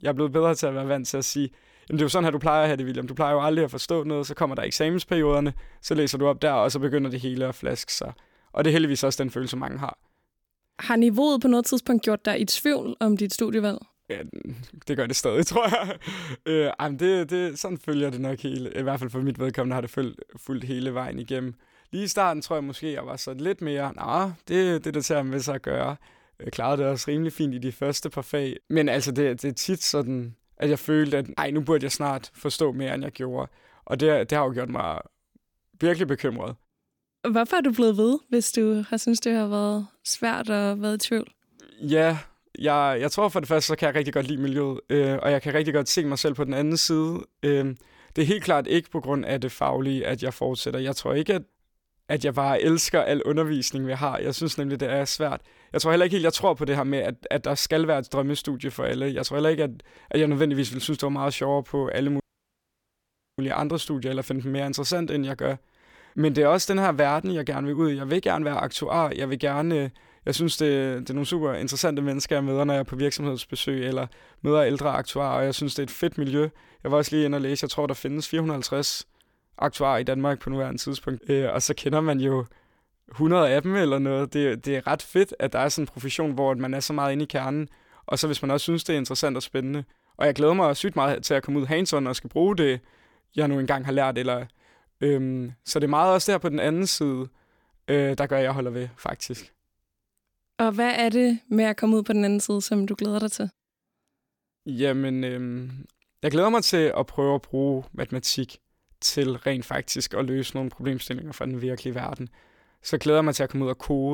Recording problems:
audio cutting out; at 1:02 for 1 s
abrupt cut into speech; at the end

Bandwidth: 18 kHz